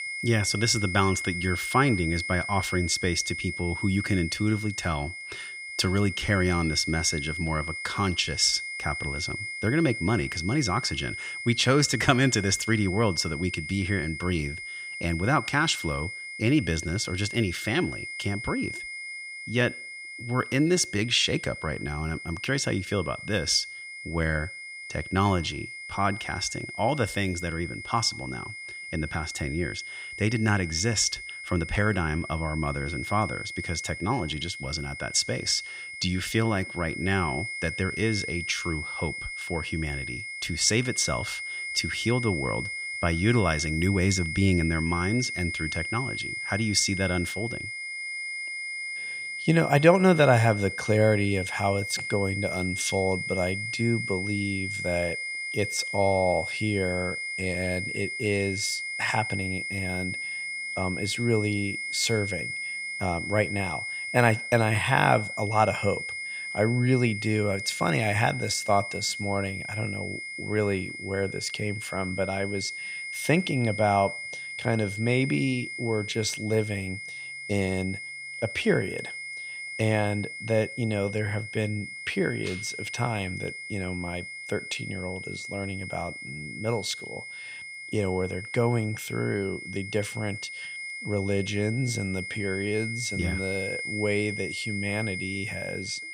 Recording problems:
high-pitched whine; loud; throughout; 2 kHz, 6 dB below the speech

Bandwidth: 15.5 kHz